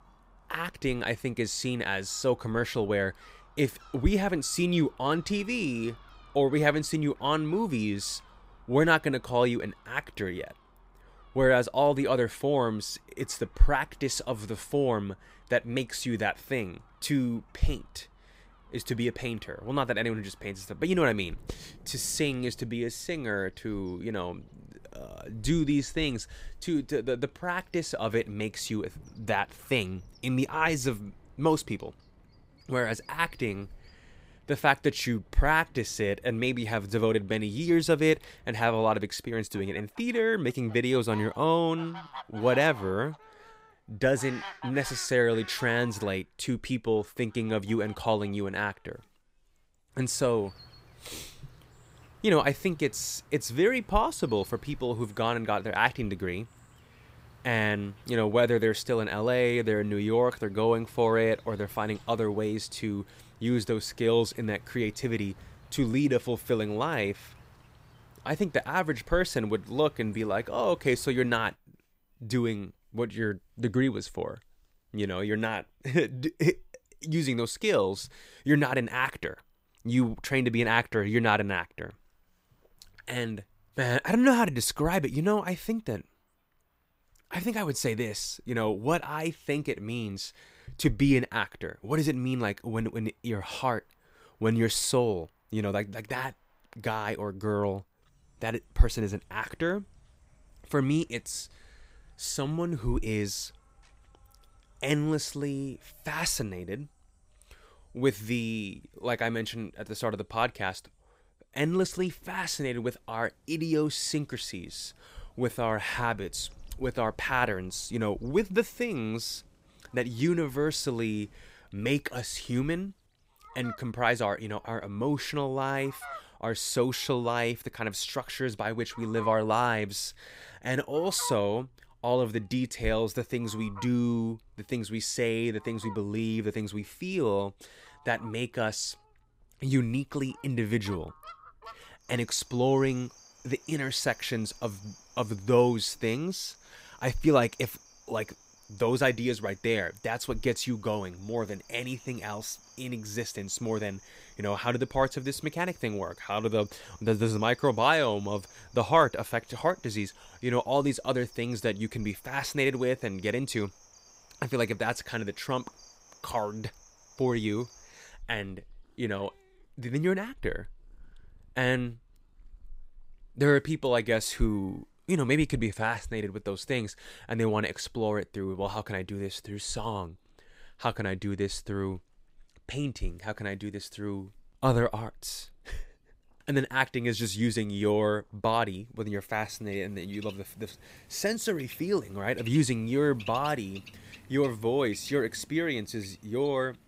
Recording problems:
animal sounds; faint; throughout; 25 dB below the speech

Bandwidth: 15.5 kHz